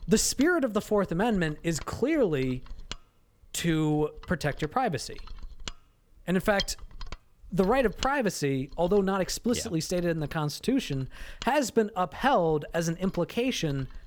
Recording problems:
machinery noise; noticeable; throughout; 15 dB below the speech

